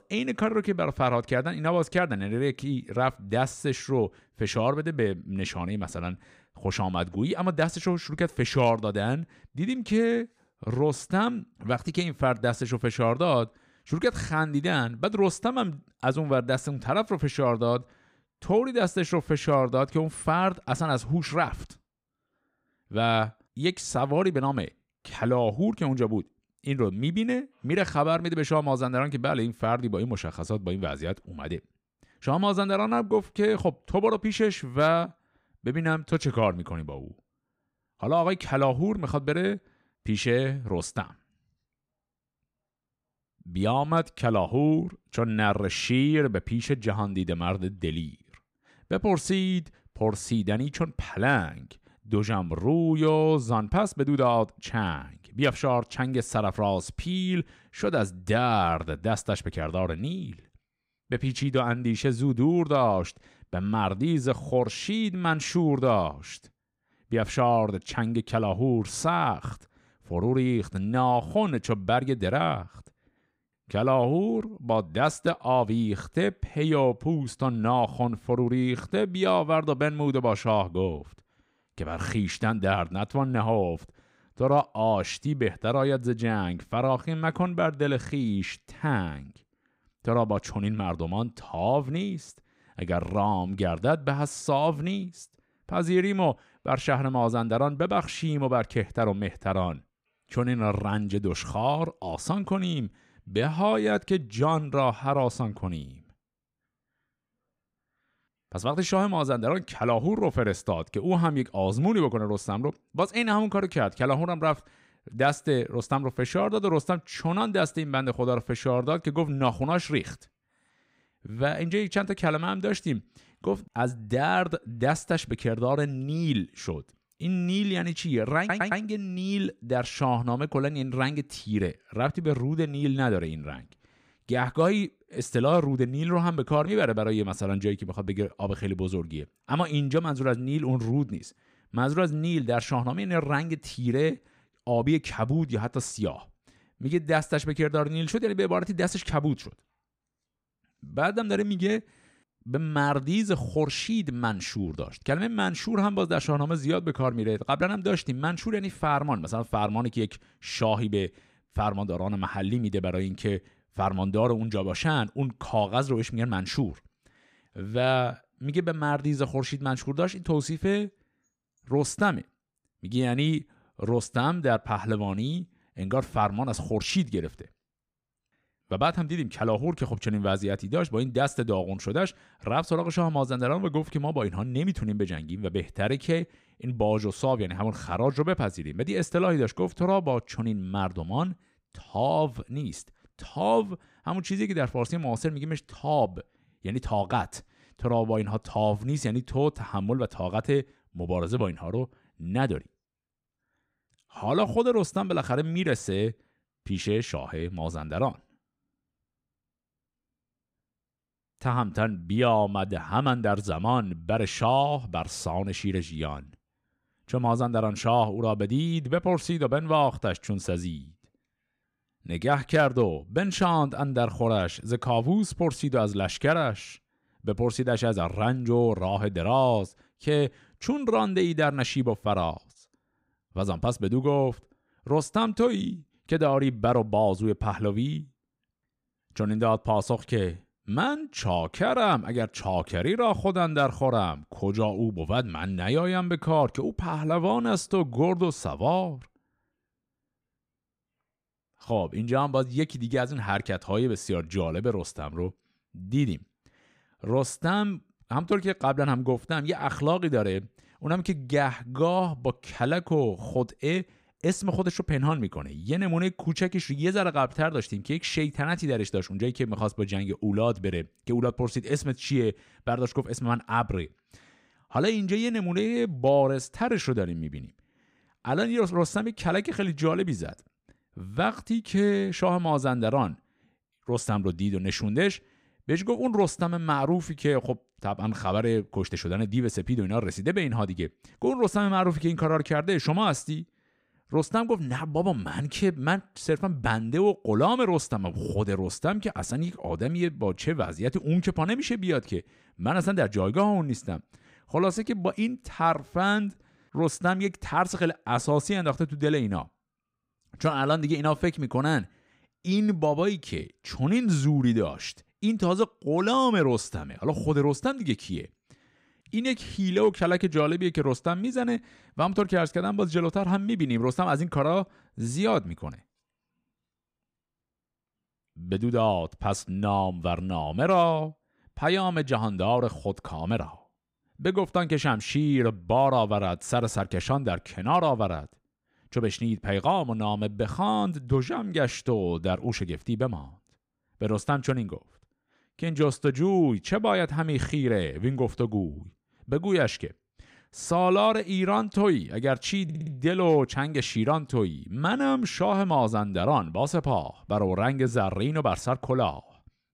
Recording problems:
audio stuttering; at 2:08 and at 5:53

